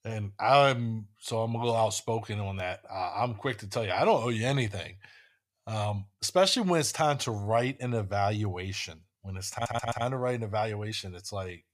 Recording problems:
audio stuttering; at 9.5 s

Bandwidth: 15 kHz